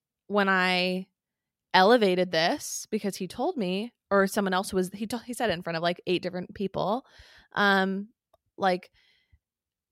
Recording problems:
none

